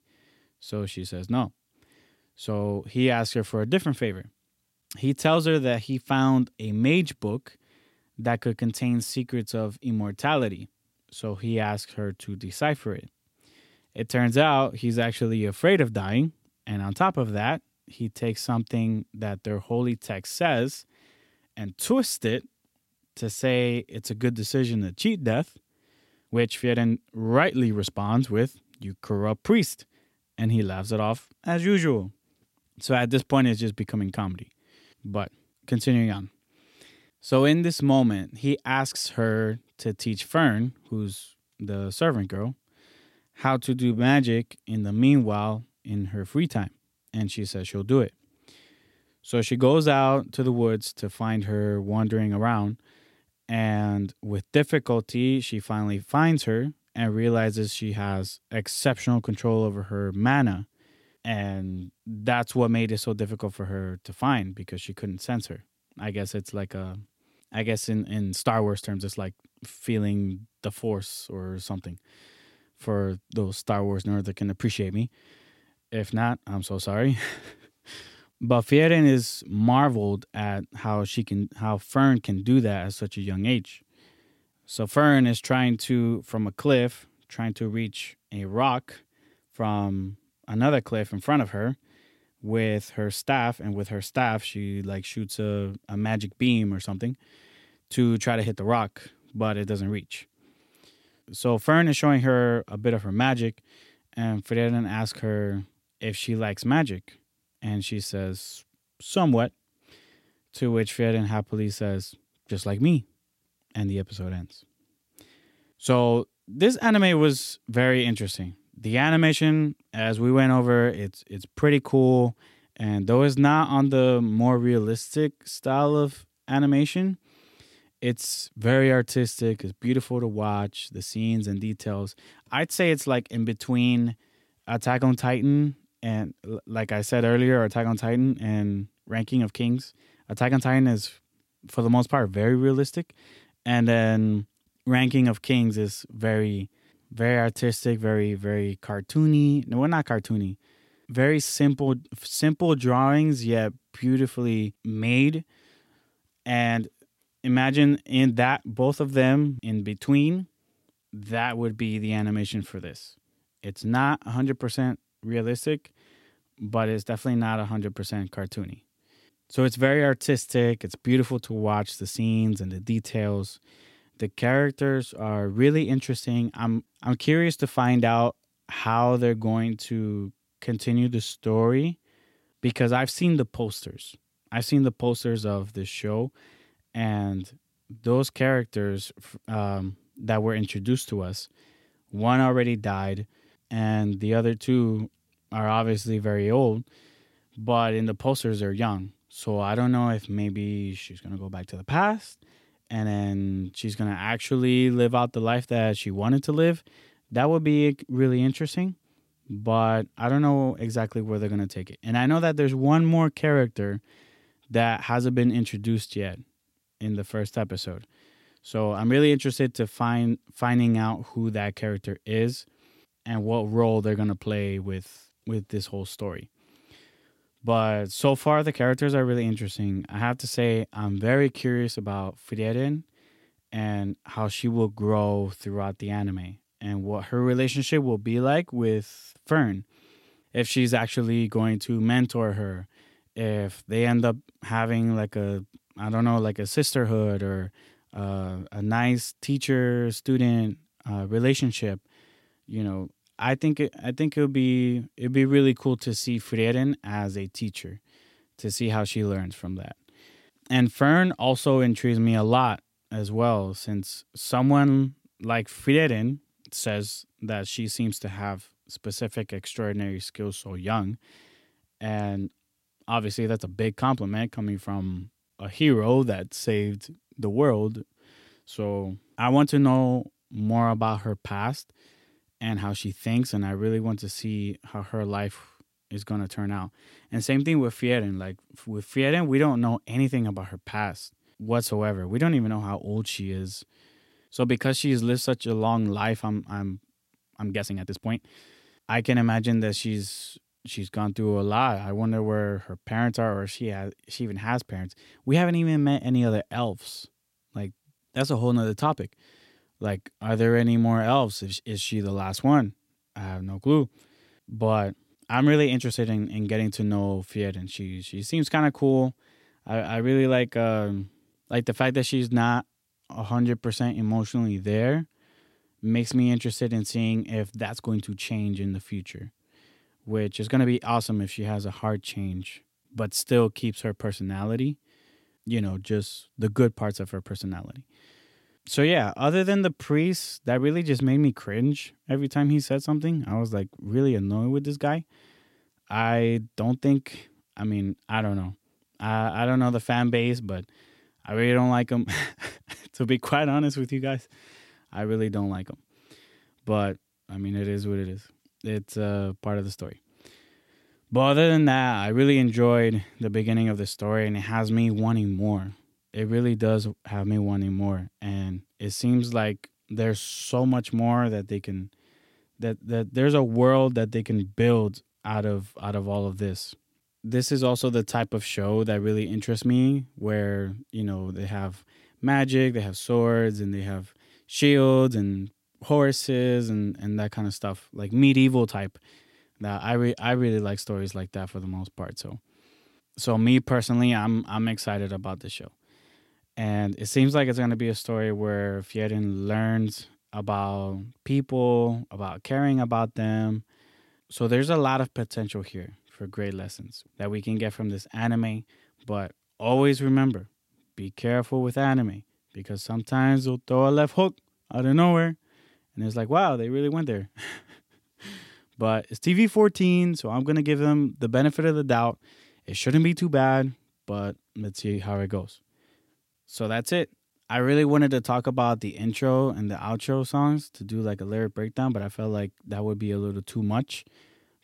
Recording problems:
uneven, jittery; strongly; from 23 s to 5:52

